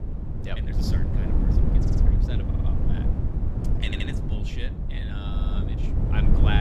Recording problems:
wind noise on the microphone; heavy; 1 dB above the speech
uneven, jittery; strongly; from 0.5 to 6 s
audio stuttering; 4 times, first at 2 s
abrupt cut into speech; at the end

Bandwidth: 14.5 kHz